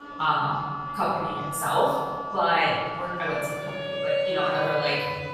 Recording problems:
room echo; strong; dies away in 1.4 s
off-mic speech; far
background music; loud; throughout; 5 dB below the speech
murmuring crowd; faint; throughout; 25 dB below the speech

